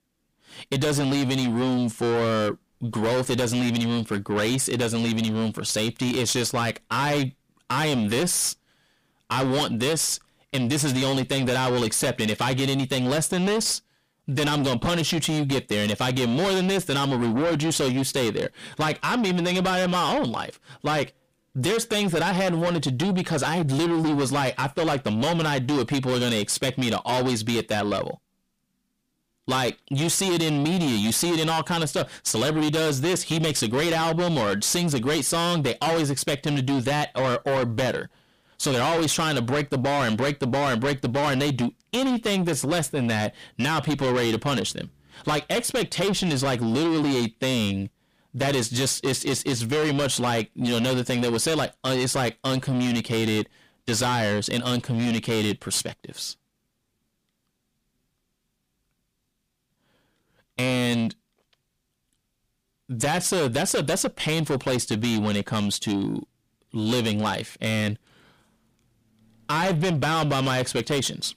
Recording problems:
distortion; heavy; 7 dB below the speech

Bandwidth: 15 kHz